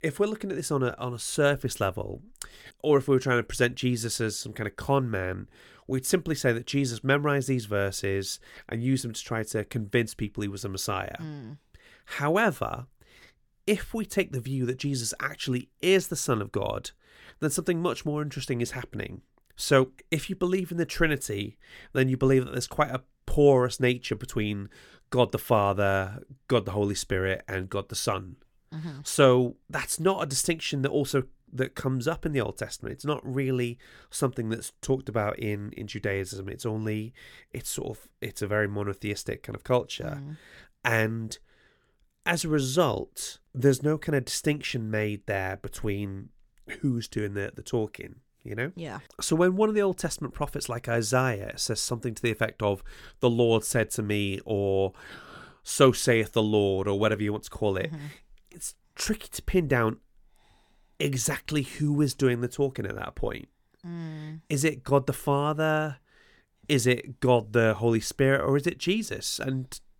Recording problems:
none

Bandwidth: 17 kHz